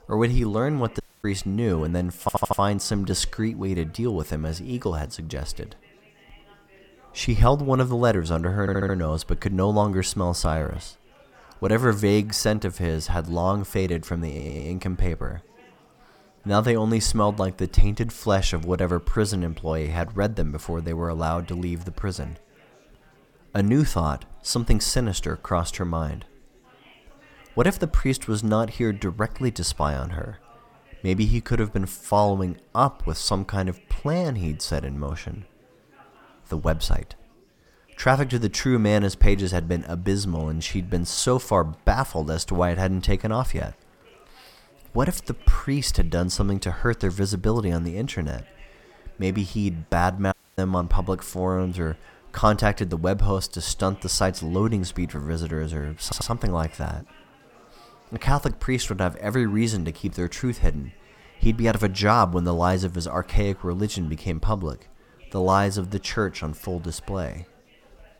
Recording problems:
chatter from many people; faint; throughout; 30 dB below the speech
audio cutting out; at 1 s and at 50 s
audio stuttering; 4 times, first at 2 s

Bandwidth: 17.5 kHz